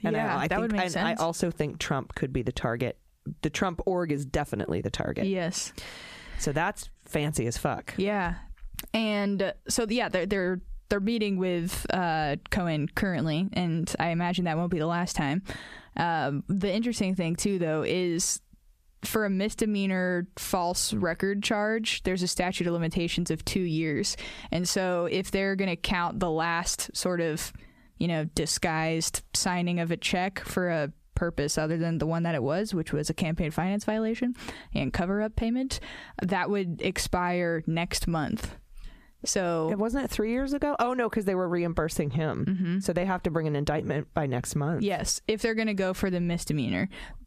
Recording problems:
squashed, flat; somewhat

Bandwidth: 14.5 kHz